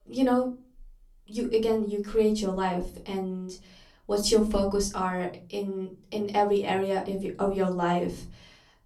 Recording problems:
off-mic speech; far
room echo; very slight; dies away in 0.3 s

